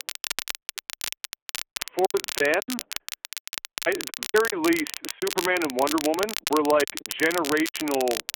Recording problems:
phone-call audio; poor line
crackle, like an old record; loud; 7 dB below the speech
choppy; very; 16% of the speech affected

